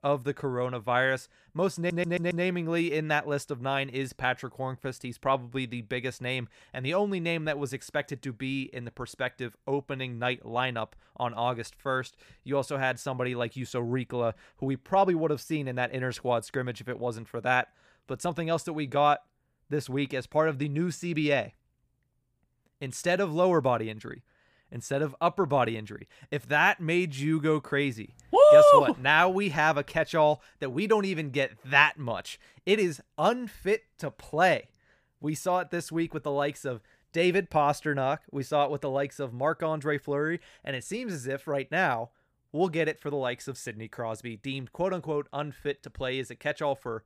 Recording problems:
audio stuttering; at 2 s

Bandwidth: 15 kHz